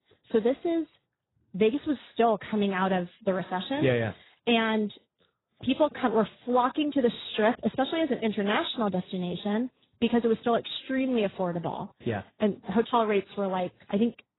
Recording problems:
garbled, watery; badly; nothing above 4 kHz

